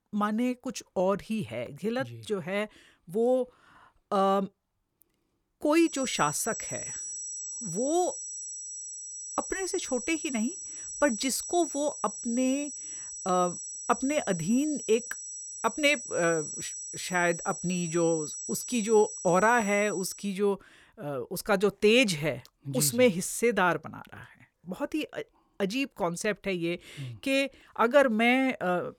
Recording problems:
high-pitched whine; loud; from 6 to 20 s; 8 kHz, 8 dB below the speech

